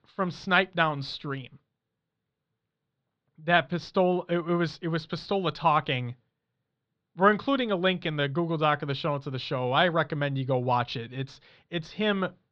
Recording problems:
muffled; slightly; fading above 4 kHz

